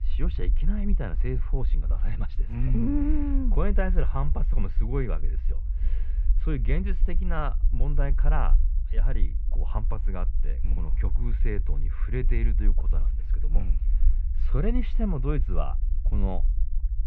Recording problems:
muffled; very; fading above 2.5 kHz
low rumble; noticeable; throughout; 15 dB below the speech

